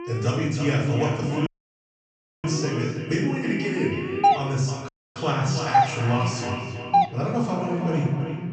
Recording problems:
echo of what is said; strong; throughout; 320 ms later, 7 dB below the speech
off-mic speech; far
room echo; noticeable; dies away in 0.8 s
high frequencies cut off; noticeable; nothing above 8 kHz
alarms or sirens; noticeable; throughout; 10 dB below the speech
audio cutting out; at 1.5 s for 1 s and at 5 s
doorbell; loud; from 4 to 7 s; peak 5 dB above the speech

